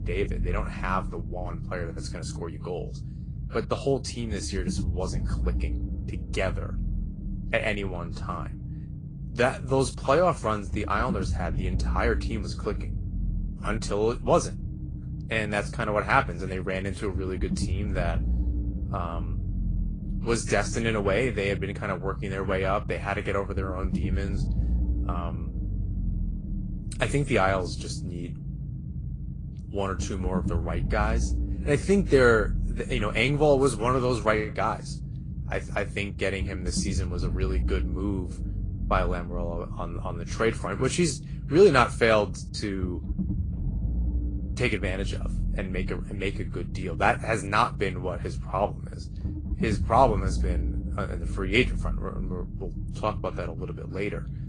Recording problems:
garbled, watery; slightly
low rumble; noticeable; throughout; 20 dB below the speech

